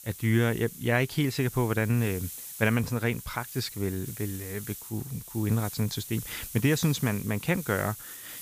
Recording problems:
hiss; noticeable; throughout; 10 dB below the speech

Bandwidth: 15 kHz